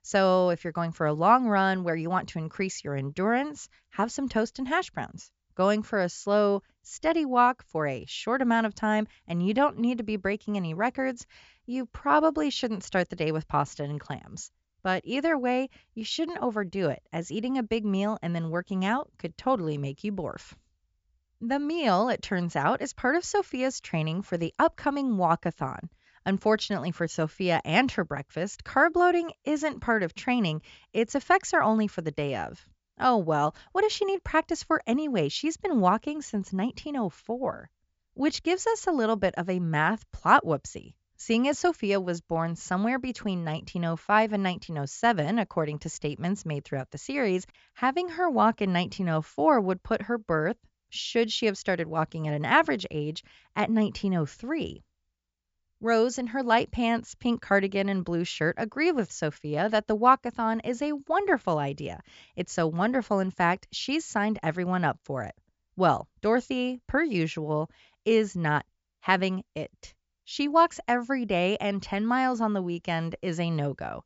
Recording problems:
high frequencies cut off; noticeable; nothing above 7.5 kHz

